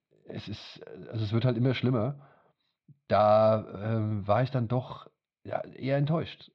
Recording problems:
muffled; very; fading above 4 kHz

